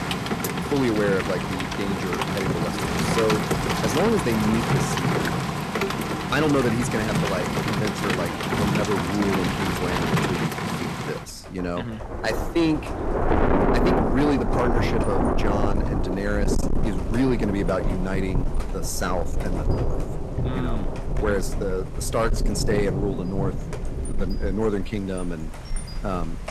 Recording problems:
distortion; slight; 10 dB below the speech
rain or running water; very loud; throughout; 1 dB above the speech

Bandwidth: 13.5 kHz